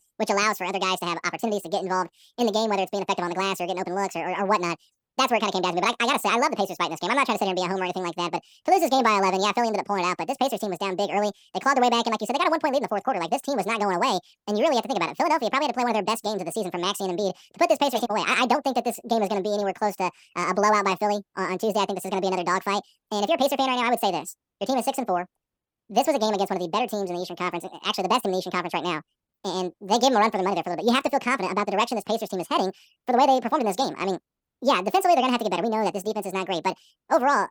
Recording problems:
wrong speed and pitch; too fast and too high; 1.7 times normal speed

